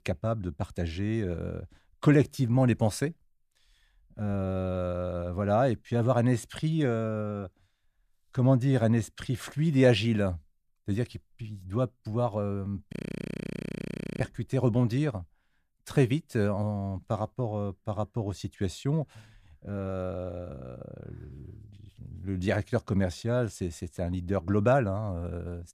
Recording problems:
audio freezing; at 13 s for 1.5 s

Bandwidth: 14.5 kHz